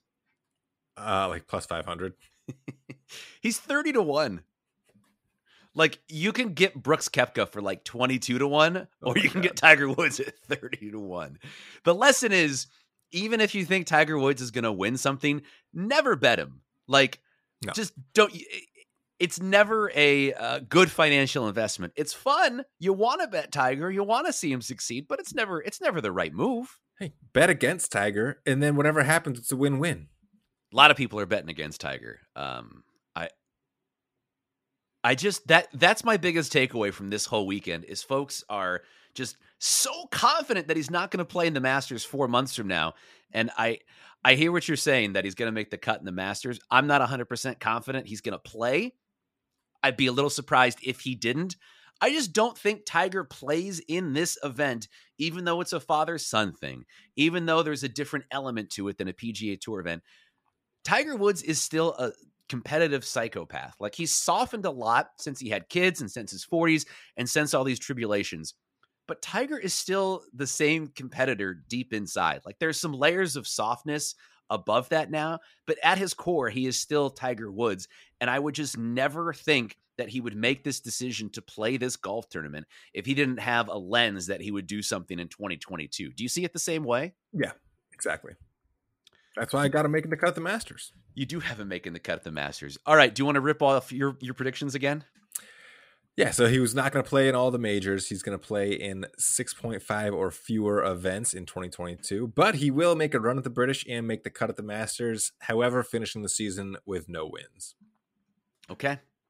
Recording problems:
none

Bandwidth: 15.5 kHz